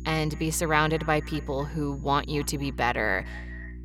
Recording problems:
echo of what is said; faint; throughout; 250 ms later, 20 dB below the speech
electrical hum; faint; throughout; 60 Hz, 25 dB below the speech
high-pitched whine; faint; until 2.5 s; 6.5 kHz, 35 dB below the speech

